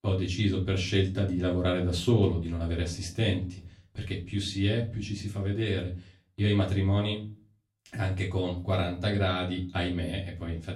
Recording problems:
off-mic speech; far
room echo; slight; dies away in 0.4 s

